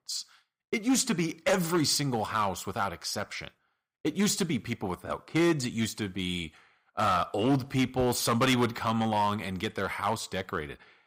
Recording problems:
distortion; slight; 4% of the sound clipped

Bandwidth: 15.5 kHz